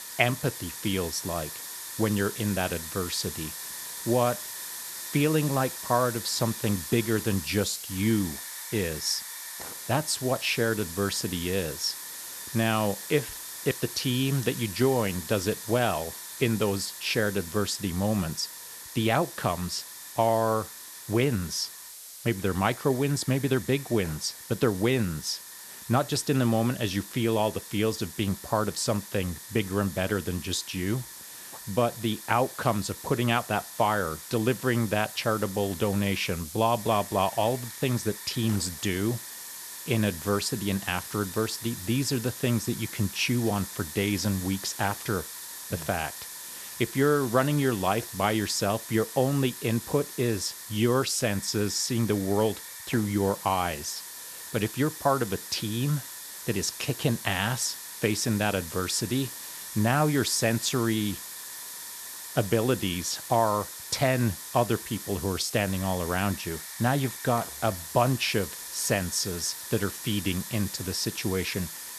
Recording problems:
hiss; loud; throughout; 10 dB below the speech

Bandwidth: 13.5 kHz